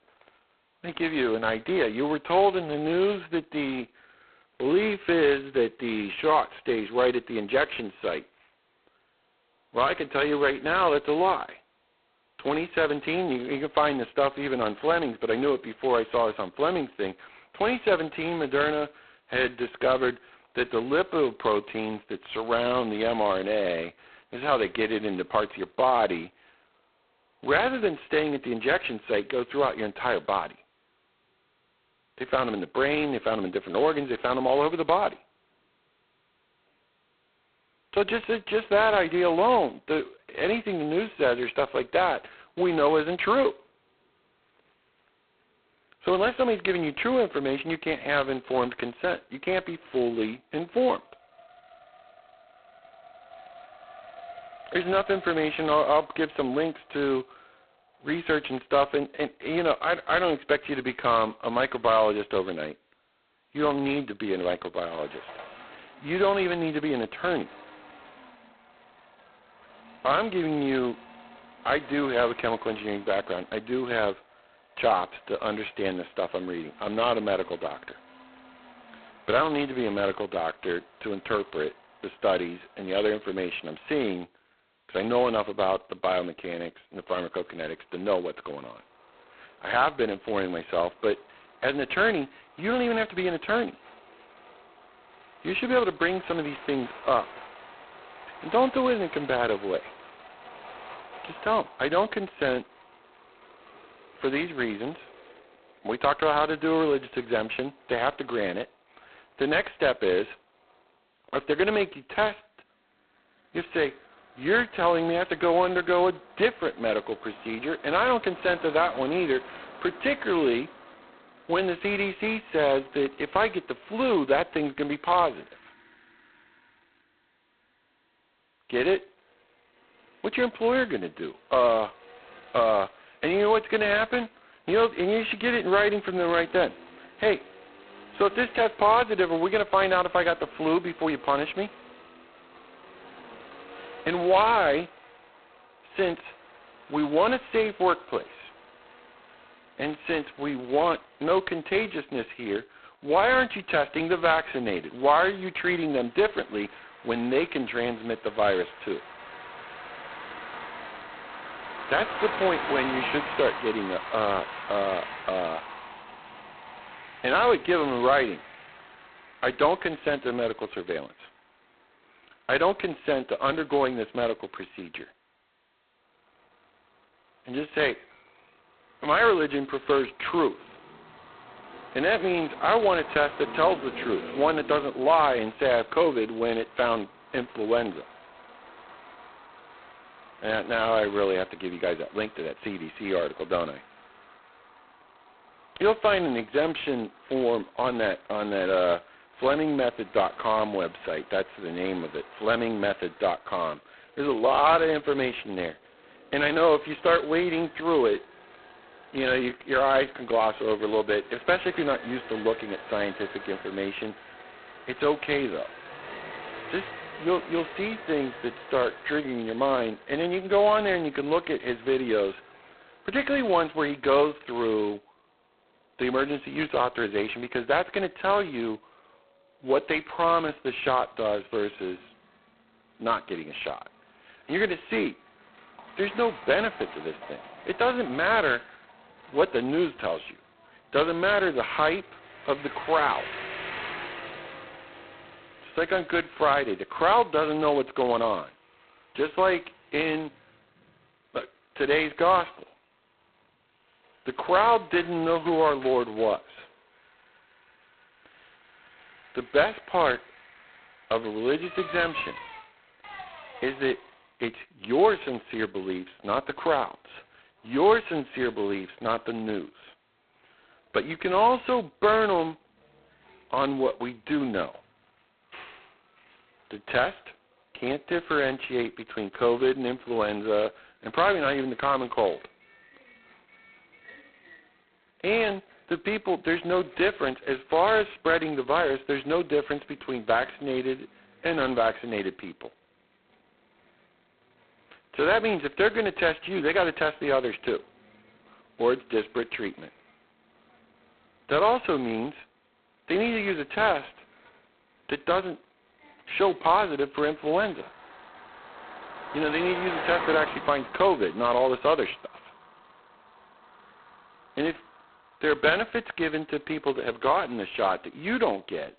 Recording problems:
phone-call audio; poor line; nothing above 4 kHz
traffic noise; noticeable; throughout; 15 dB below the speech

